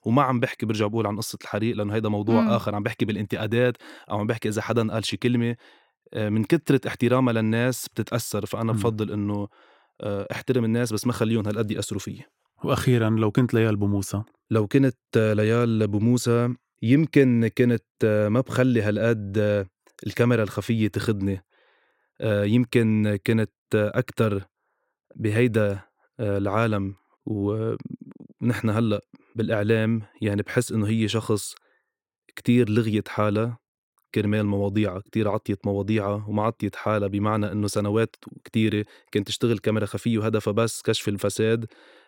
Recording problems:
none

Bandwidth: 16.5 kHz